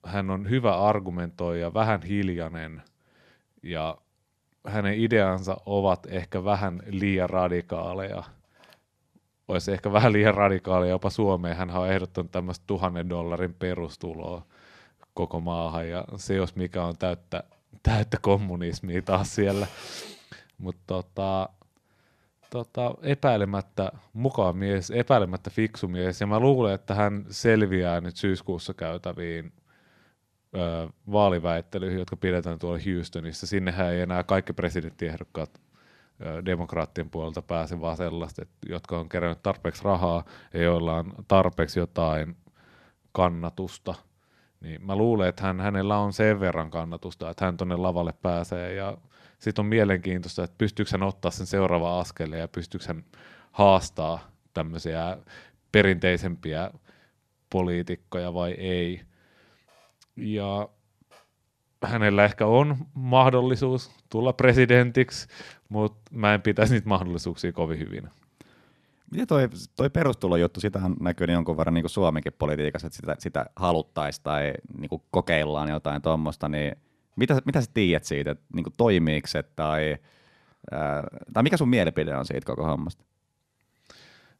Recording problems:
none

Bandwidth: 13.5 kHz